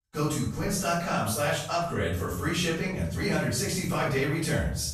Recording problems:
off-mic speech; far
room echo; noticeable; dies away in 0.6 s

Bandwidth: 14 kHz